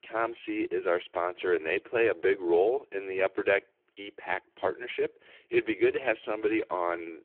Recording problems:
phone-call audio; poor line

